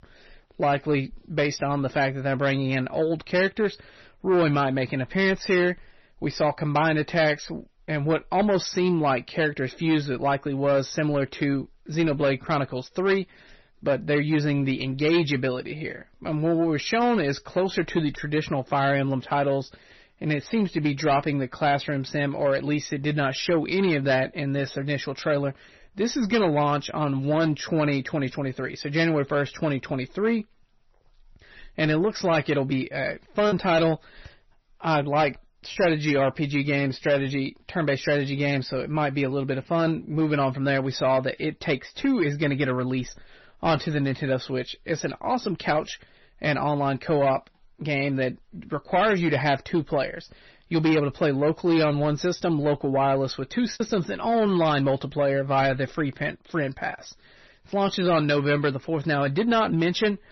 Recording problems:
distortion; slight; 10 dB below the speech
garbled, watery; slightly; nothing above 6 kHz
choppy; occasionally; from 33 to 36 s and from 52 to 54 s; 2% of the speech affected

